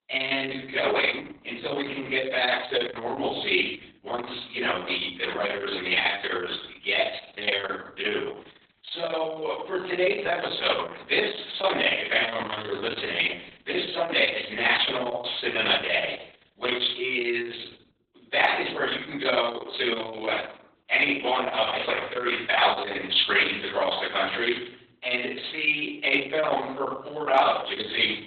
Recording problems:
off-mic speech; far
garbled, watery; badly; nothing above 4 kHz
room echo; noticeable; dies away in 0.6 s
thin; somewhat; fading below 500 Hz

